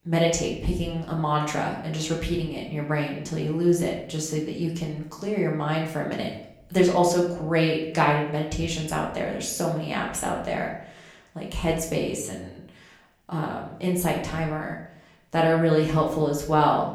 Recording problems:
off-mic speech; far
room echo; slight; dies away in 0.6 s

